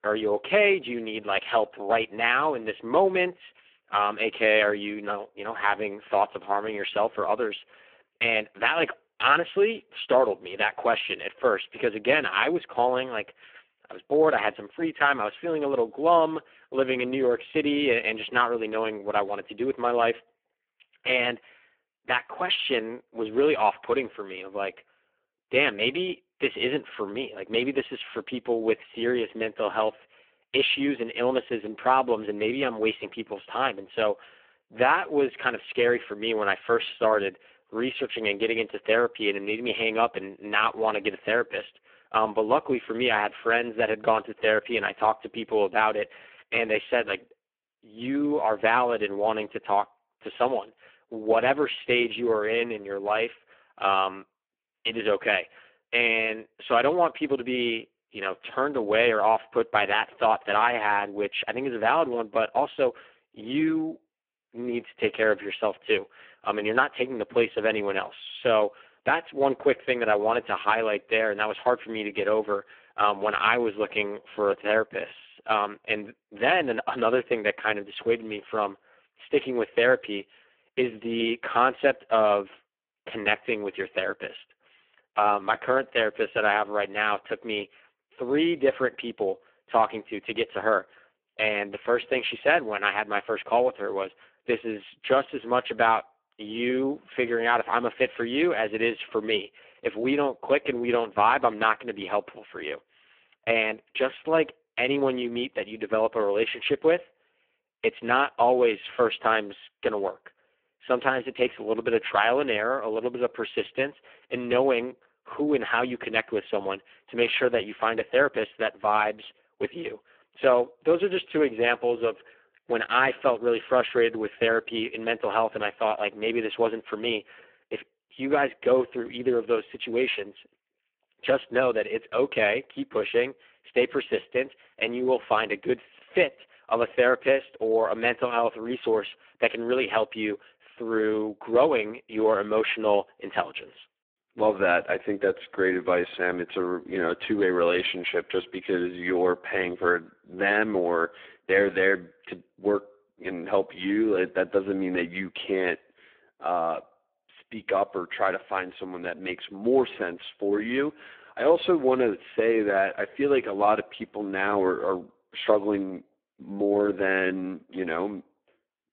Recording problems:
phone-call audio; poor line

